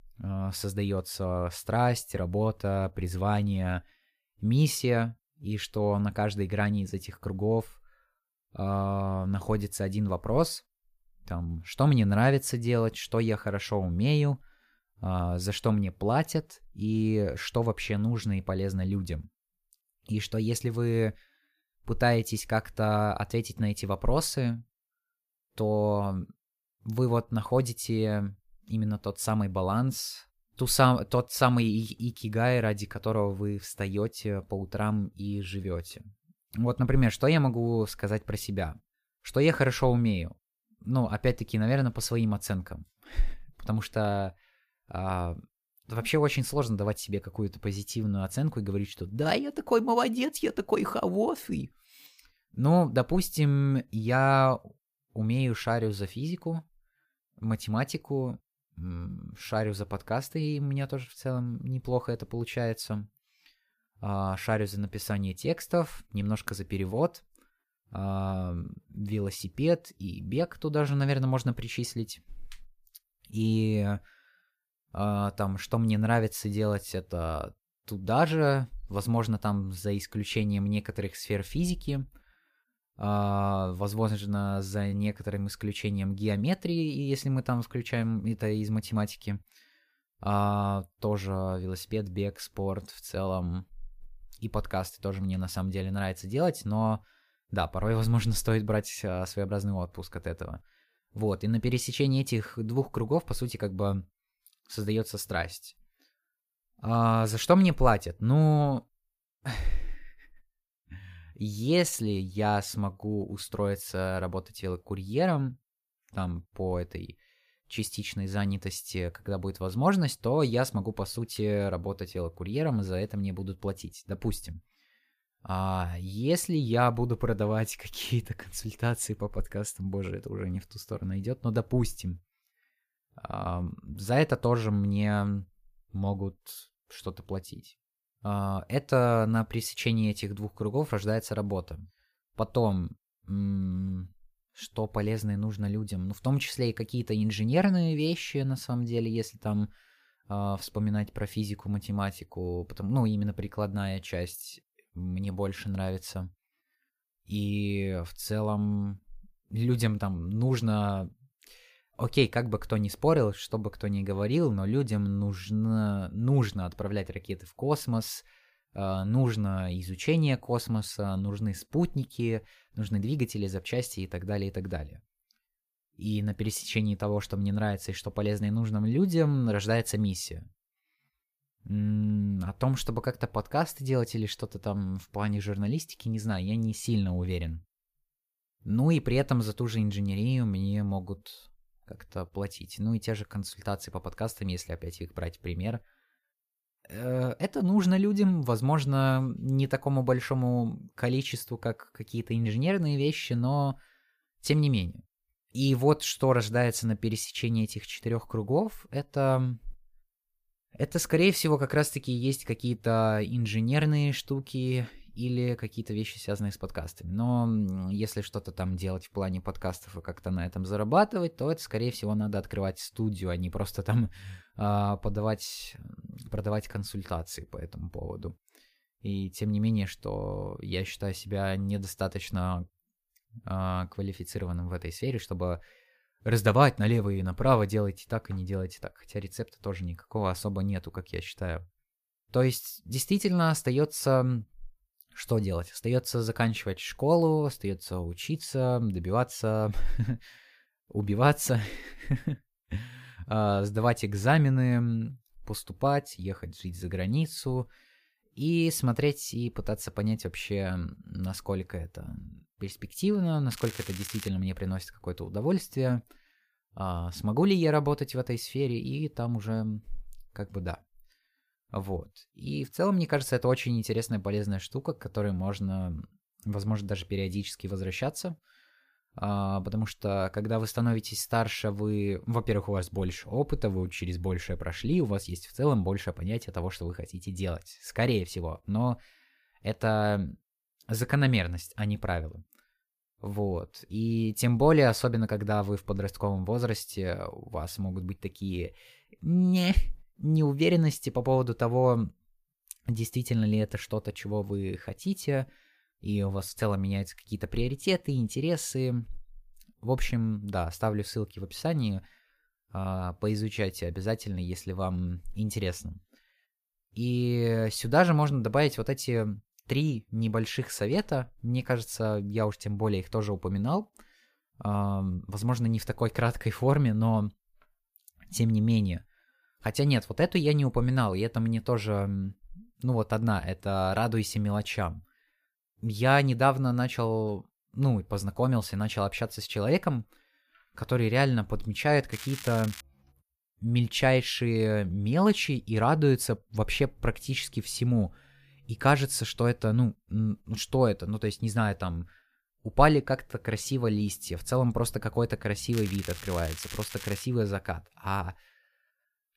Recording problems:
crackling; noticeable; at 4:24, at 5:42 and from 5:56 to 5:57; 10 dB below the speech

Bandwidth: 15 kHz